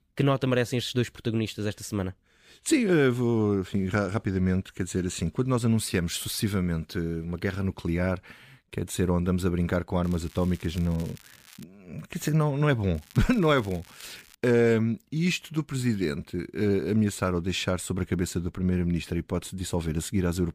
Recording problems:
crackling; faint; from 10 to 12 s and from 13 to 14 s; 25 dB below the speech

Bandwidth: 15 kHz